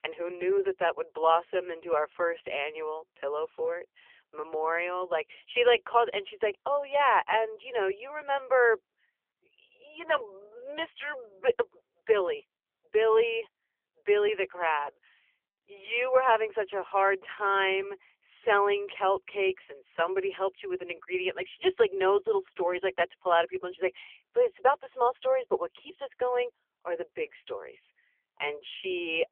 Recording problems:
phone-call audio; poor line; nothing above 3 kHz

